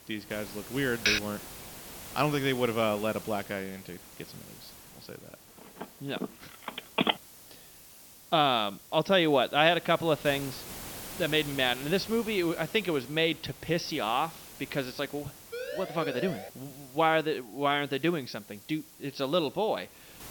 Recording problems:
high frequencies cut off; noticeable; nothing above 6 kHz
hiss; noticeable; throughout; 15 dB below the speech
keyboard typing; loud; at 1 s; peak 2 dB above the speech
phone ringing; loud; from 6 to 7 s; peak 1 dB above the speech
siren; noticeable; at 16 s; peak 8 dB below the speech

